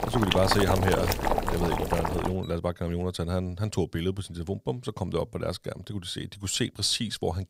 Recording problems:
household noises; very loud; until 2 s; 1 dB above the speech

